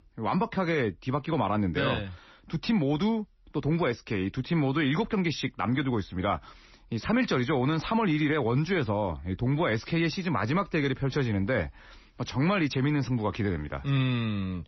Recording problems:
garbled, watery; slightly; nothing above 6 kHz

